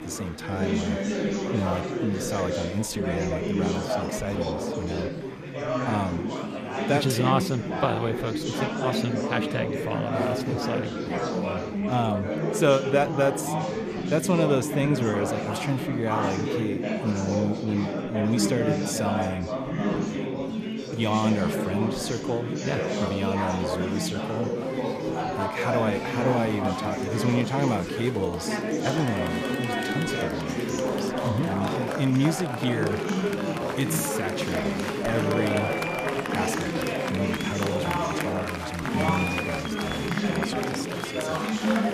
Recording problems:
chatter from many people; very loud; throughout; 1 dB above the speech

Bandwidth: 14.5 kHz